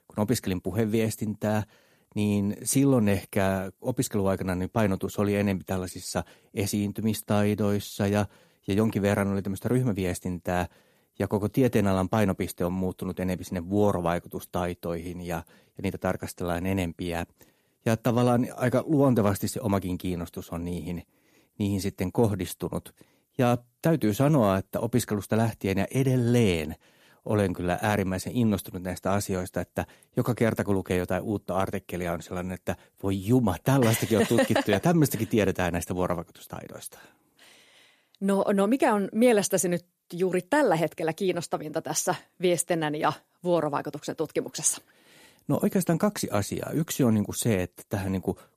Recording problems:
none

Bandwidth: 14.5 kHz